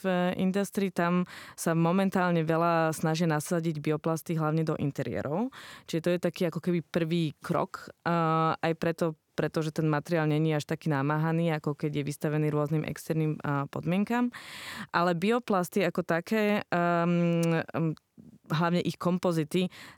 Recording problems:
none

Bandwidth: 19 kHz